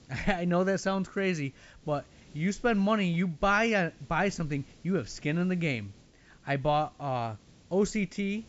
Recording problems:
high frequencies cut off; noticeable; nothing above 8 kHz
hiss; faint; throughout; 30 dB below the speech

